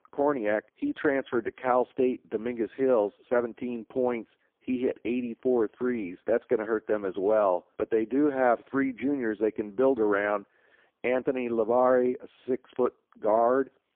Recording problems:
phone-call audio; poor line

